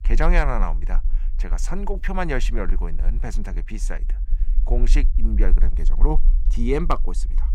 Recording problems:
low rumble; faint; throughout; 20 dB below the speech

